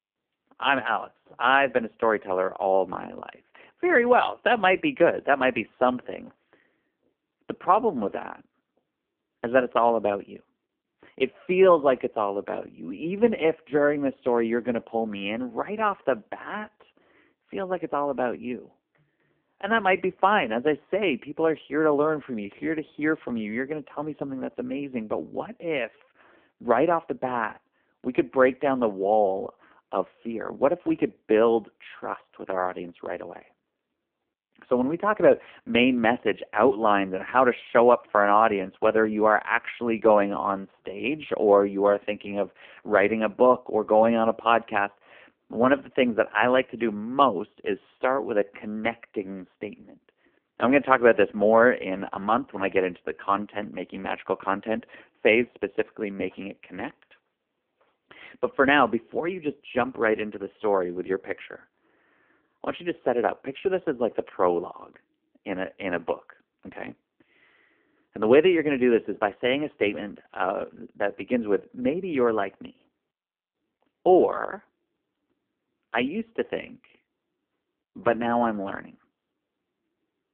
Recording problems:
phone-call audio; poor line

